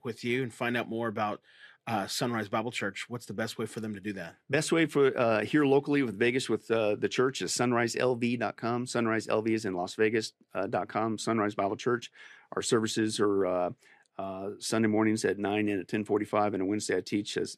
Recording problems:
none

